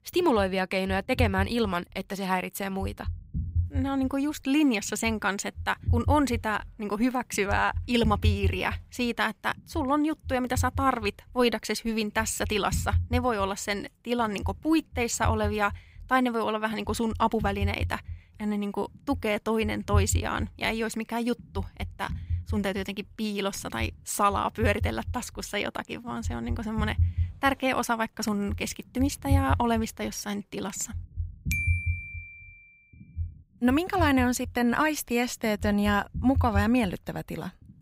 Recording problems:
low rumble; faint; throughout; 20 dB below the speech

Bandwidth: 15.5 kHz